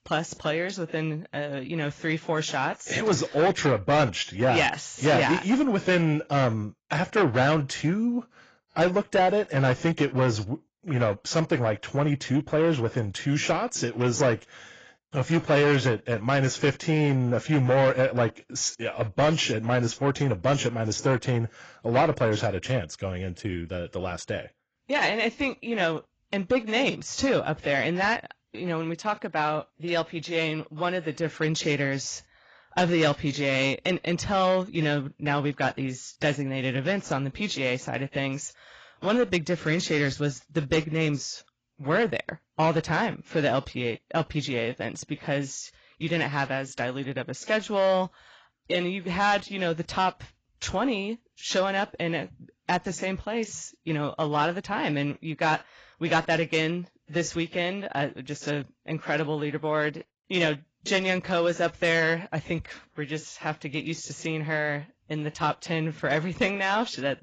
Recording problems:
garbled, watery; badly; nothing above 7.5 kHz
distortion; slight; 10 dB below the speech

